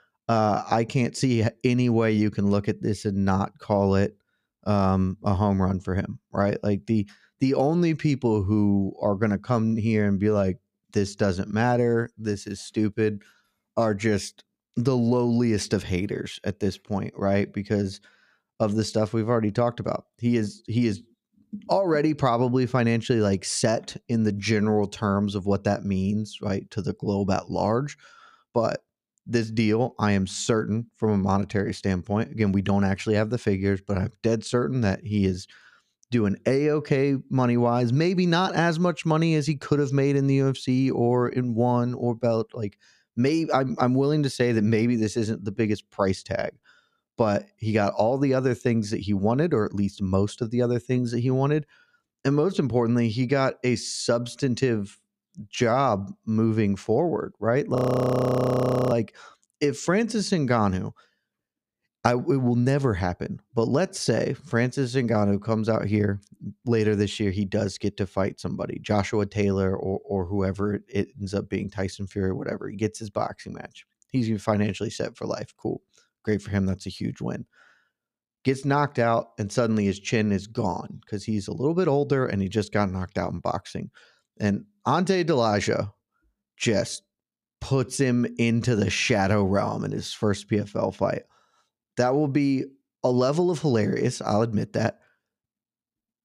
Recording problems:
audio freezing; at 58 s for 1 s

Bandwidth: 15.5 kHz